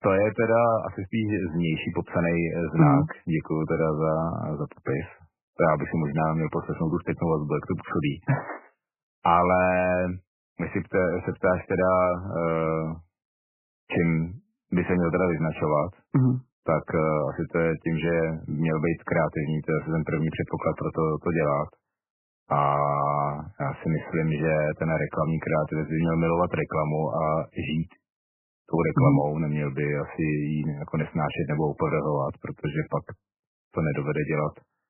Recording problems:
garbled, watery; badly; nothing above 3 kHz

